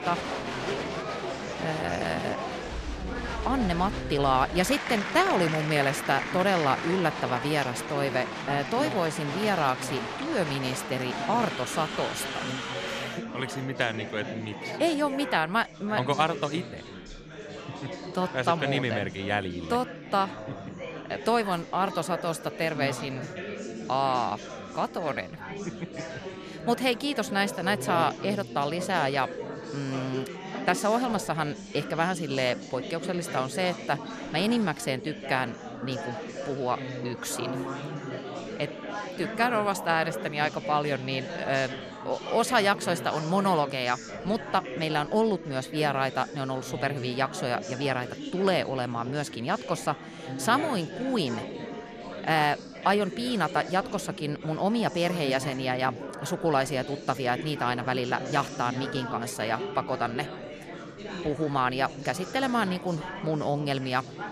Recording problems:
chatter from many people; loud; throughout; 8 dB below the speech

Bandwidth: 14.5 kHz